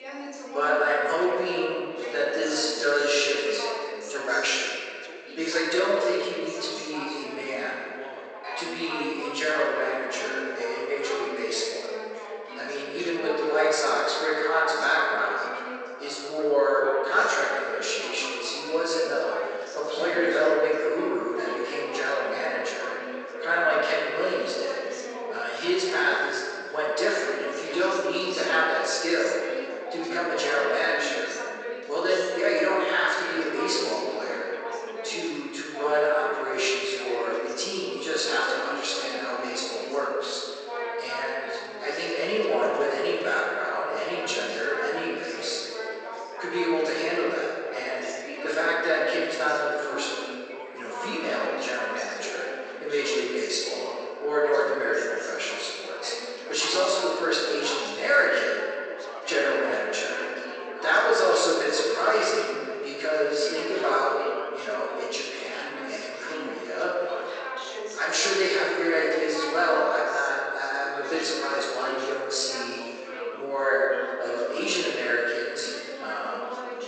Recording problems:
room echo; strong; dies away in 1.9 s
off-mic speech; far
thin; very; fading below 400 Hz
garbled, watery; slightly; nothing above 8 kHz
background chatter; noticeable; throughout; 3 voices, 10 dB below the speech

